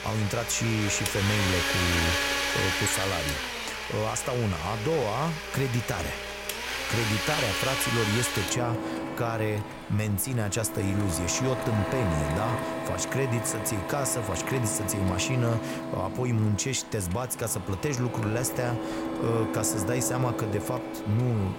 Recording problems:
household noises; loud; throughout; 2 dB below the speech

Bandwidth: 16 kHz